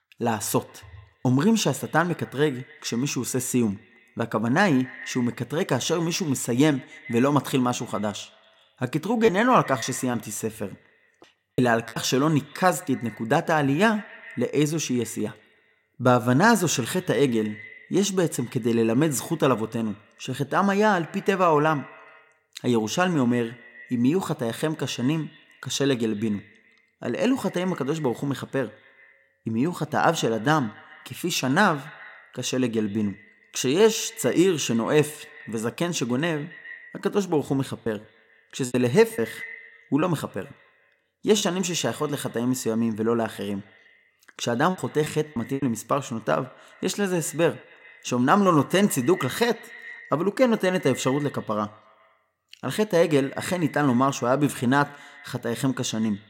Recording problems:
echo of what is said; faint; throughout; 140 ms later, 20 dB below the speech
choppy; very; from 8 to 12 s, from 38 to 41 s and at 45 s; 8% of the speech affected

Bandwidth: 16.5 kHz